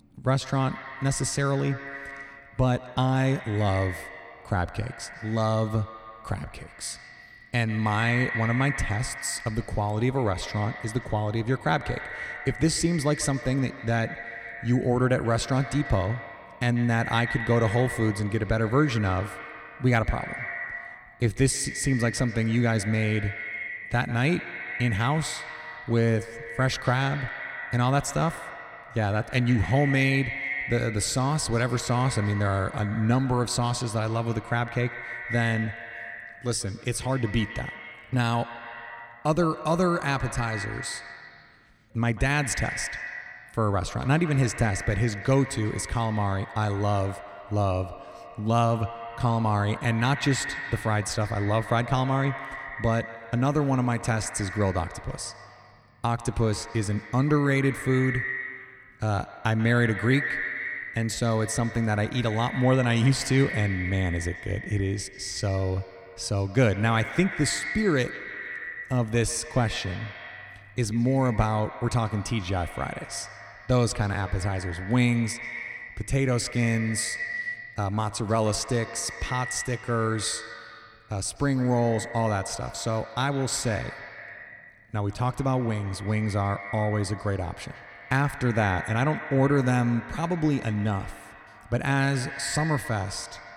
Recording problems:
echo of what is said; strong; throughout; 140 ms later, 10 dB below the speech

